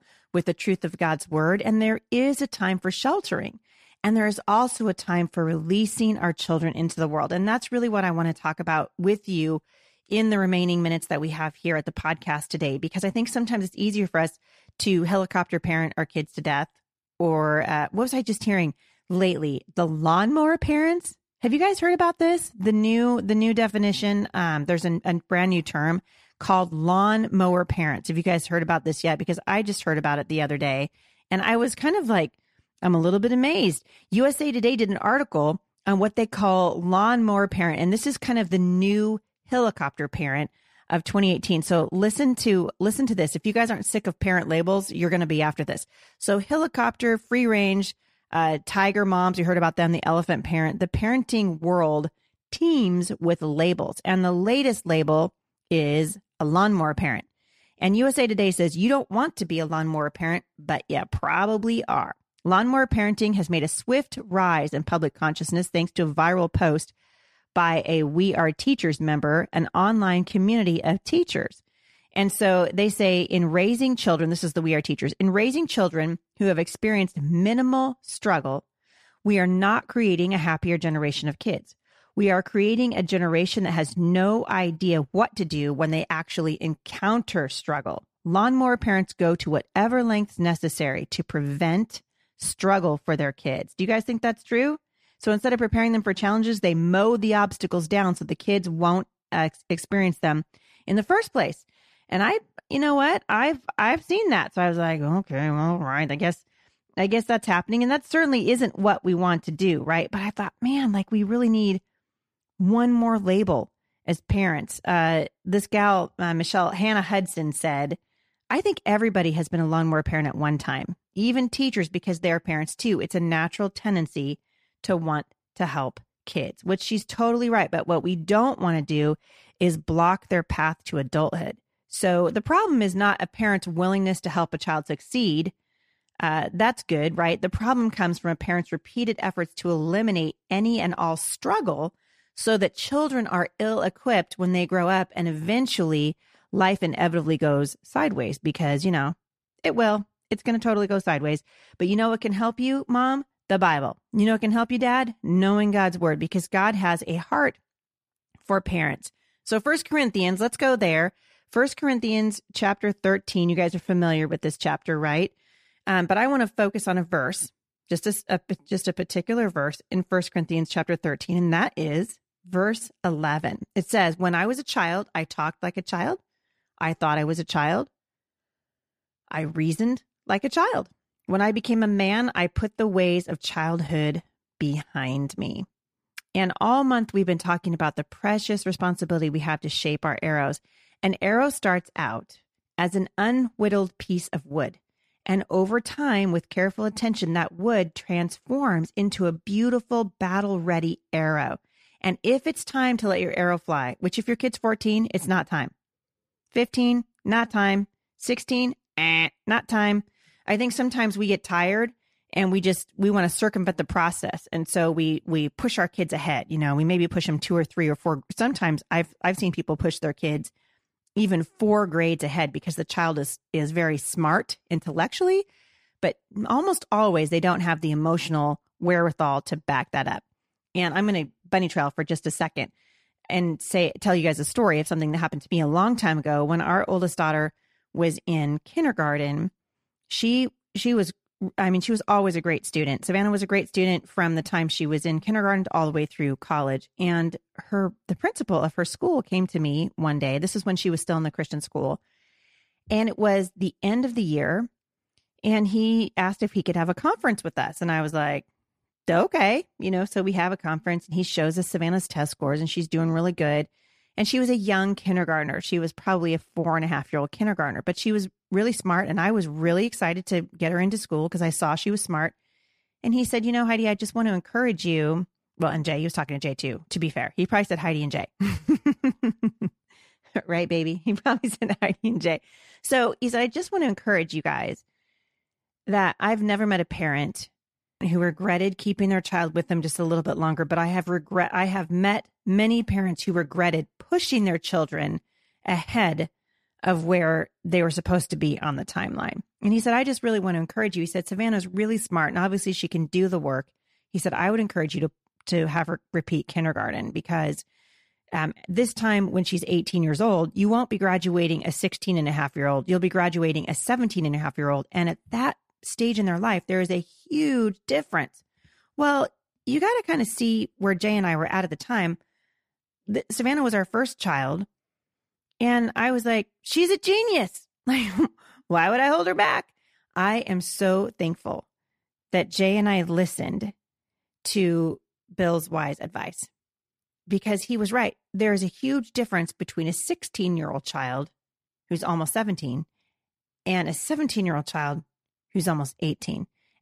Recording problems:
none

